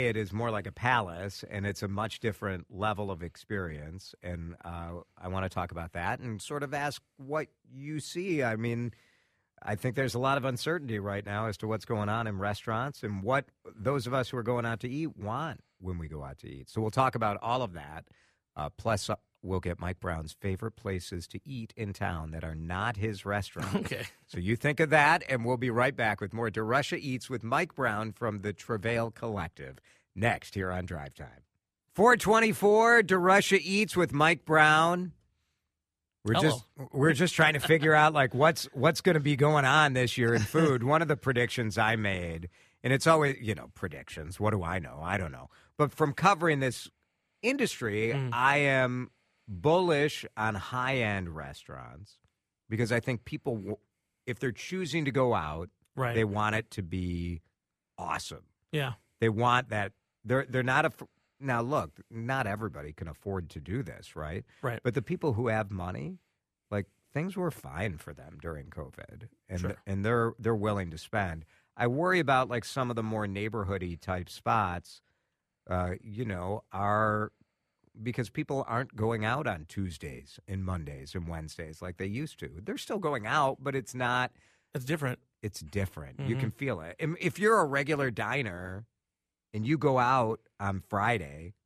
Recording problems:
abrupt cut into speech; at the start

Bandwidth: 14.5 kHz